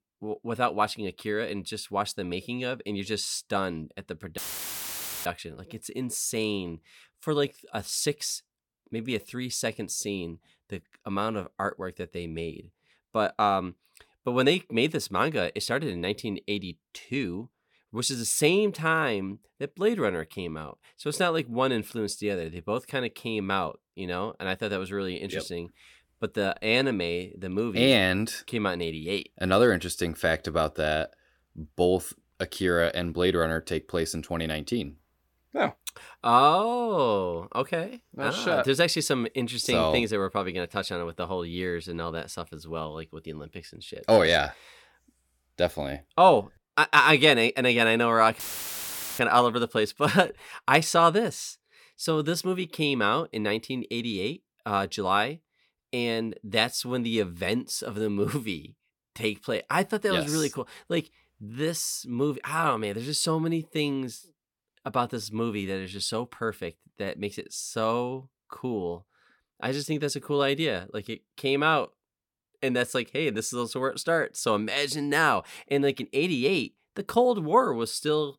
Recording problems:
audio cutting out; filled with static; at 4.5 s for 1 s and at 48 s for 1 s

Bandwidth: 17.5 kHz